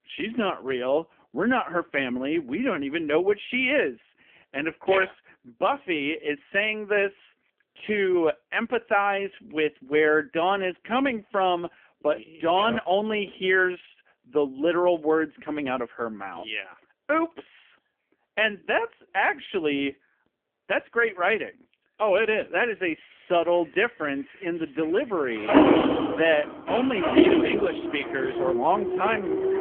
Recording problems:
phone-call audio; poor line; nothing above 3 kHz
traffic noise; very loud; from 23 s on; 2 dB above the speech

